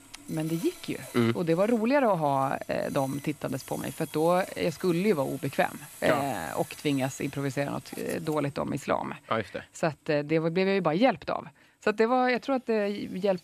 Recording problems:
machinery noise; noticeable; throughout; 20 dB below the speech

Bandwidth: 14.5 kHz